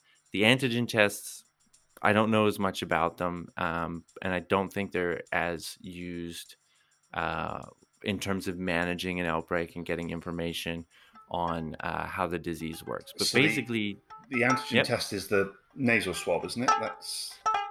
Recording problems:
background music; loud; throughout; 5 dB below the speech

